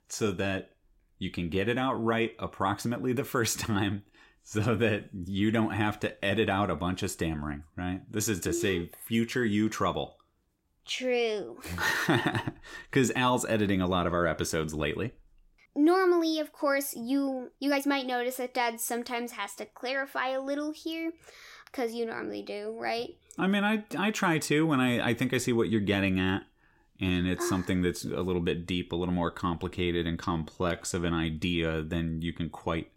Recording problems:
uneven, jittery; strongly; from 7.5 to 31 s

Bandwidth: 16 kHz